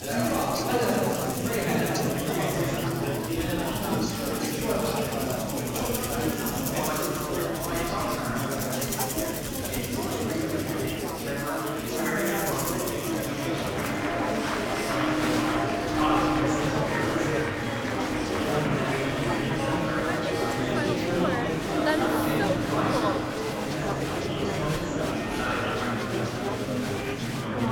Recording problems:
room echo; strong; dies away in 2.1 s
off-mic speech; far
chatter from many people; very loud; throughout; 3 dB above the speech
background music; loud; throughout; 1 dB below the speech
clattering dishes; faint; from 8 to 10 s; peak 10 dB below the speech

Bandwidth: 17.5 kHz